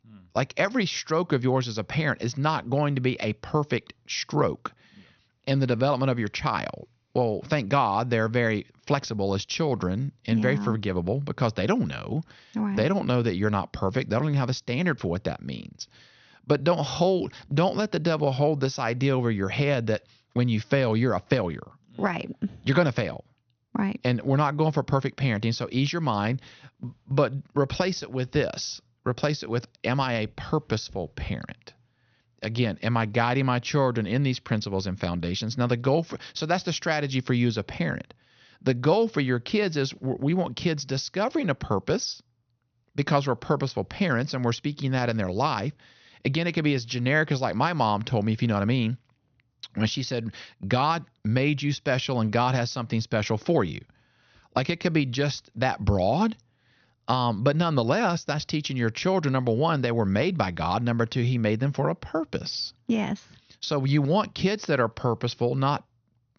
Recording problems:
high frequencies cut off; noticeable; nothing above 6.5 kHz

